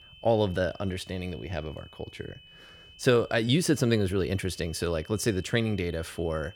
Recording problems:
high-pitched whine; faint; throughout; 3 kHz, 20 dB below the speech

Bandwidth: 18 kHz